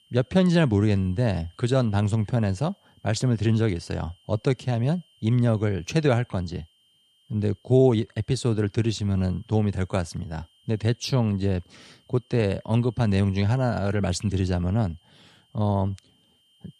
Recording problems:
high-pitched whine; faint; throughout; 3 kHz, 35 dB below the speech

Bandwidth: 14 kHz